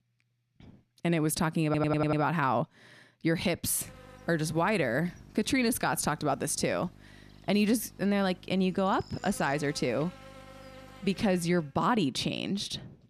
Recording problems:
electrical hum; faint; from 4 to 12 s; 50 Hz, 20 dB below the speech
audio stuttering; at 1.5 s

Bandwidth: 14.5 kHz